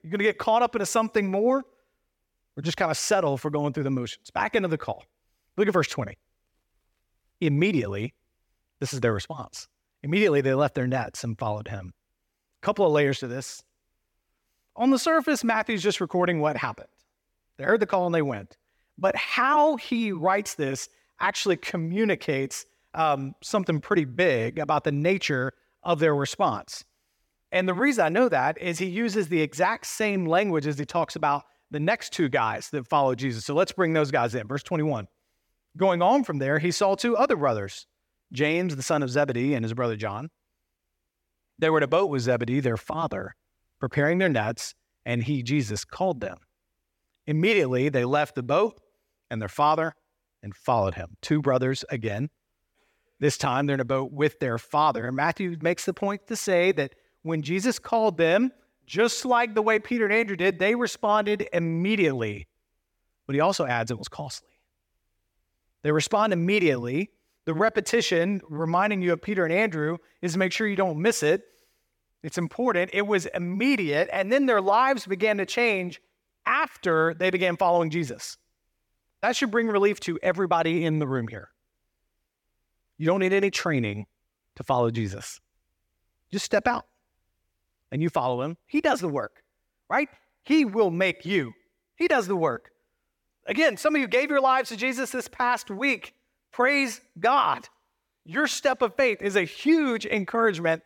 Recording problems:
none

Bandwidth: 17 kHz